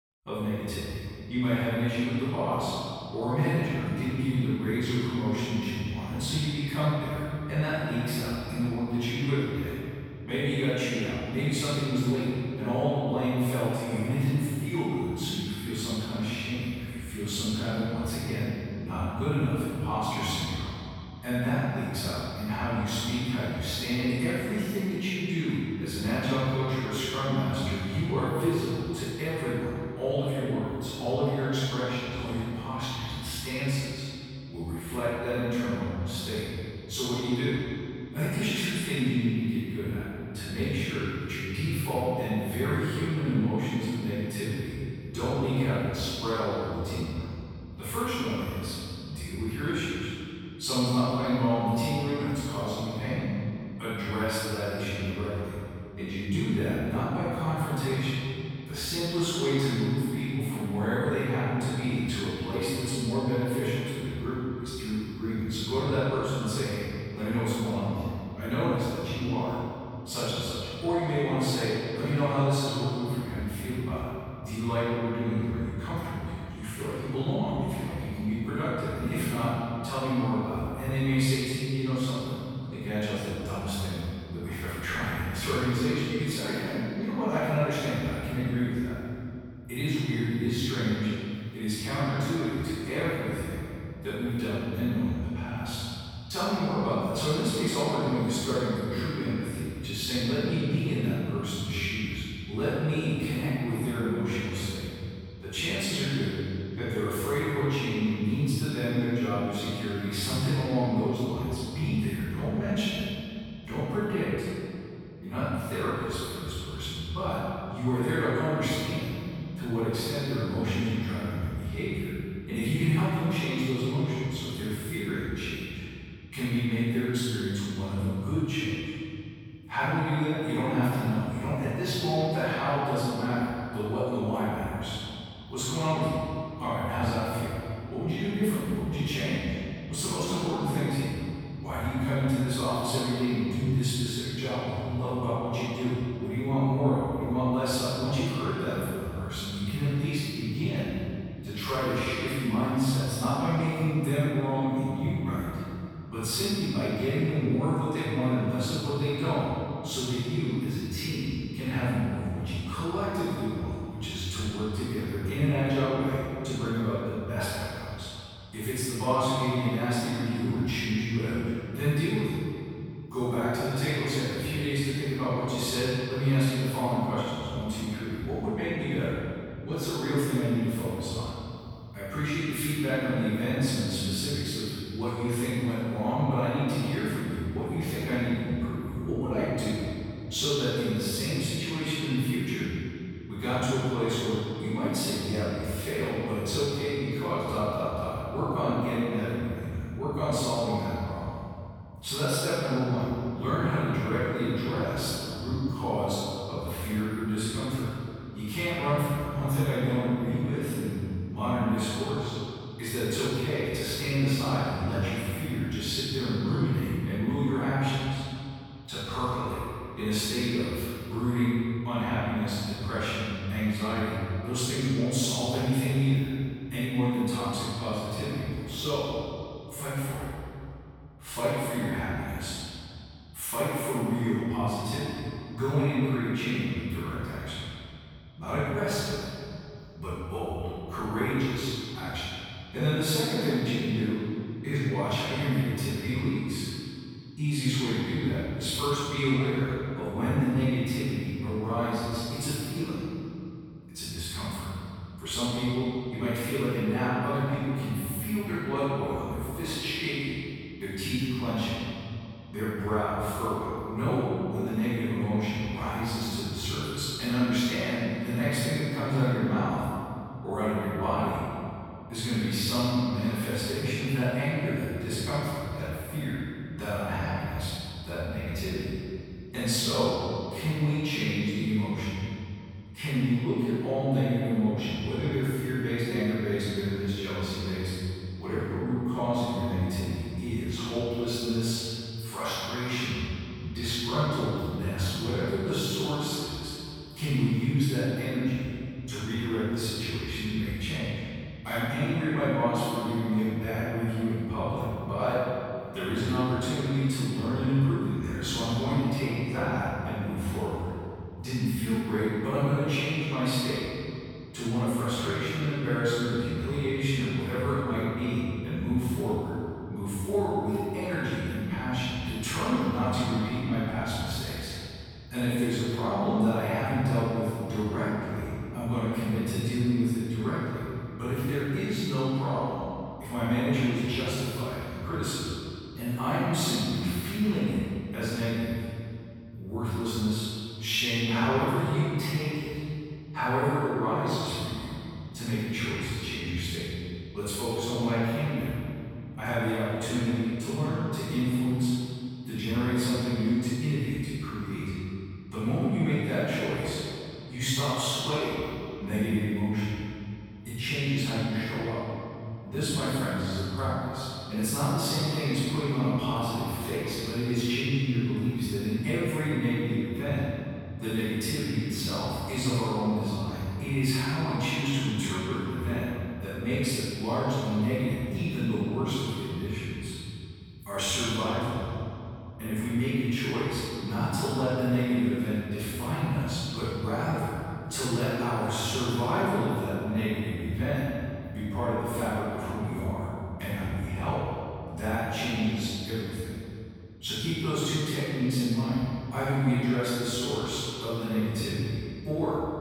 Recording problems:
room echo; strong; dies away in 2.6 s
off-mic speech; far

